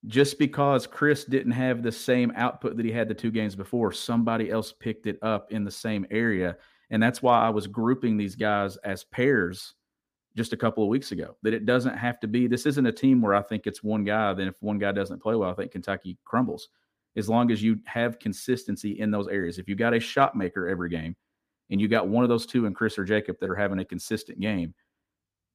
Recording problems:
none

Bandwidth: 15 kHz